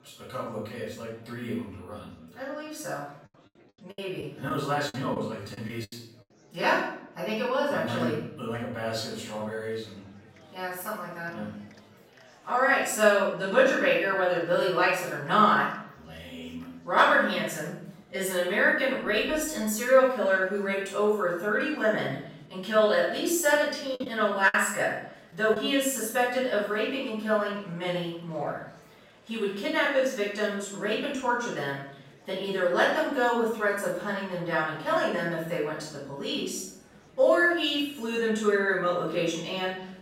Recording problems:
off-mic speech; far
room echo; noticeable; dies away in 0.6 s
murmuring crowd; faint; throughout; 30 dB below the speech
choppy; very; from 4 to 6 s and from 24 to 26 s; 10% of the speech affected

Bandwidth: 16 kHz